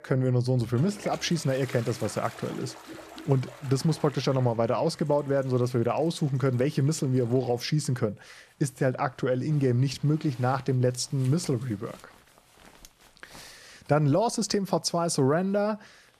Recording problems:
household noises; faint; throughout; 20 dB below the speech

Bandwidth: 14.5 kHz